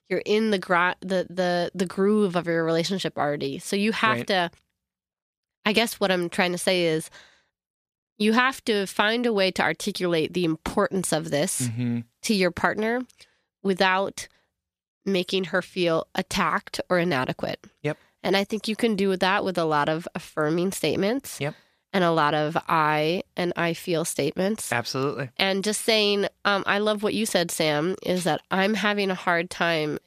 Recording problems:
none

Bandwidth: 14.5 kHz